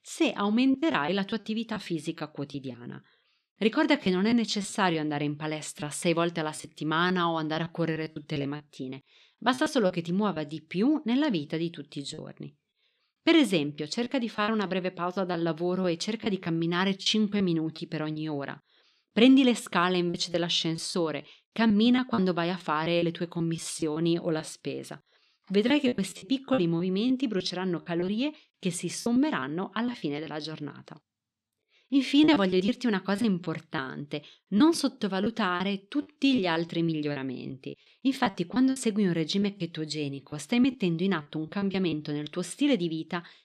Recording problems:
choppy; very; 9% of the speech affected

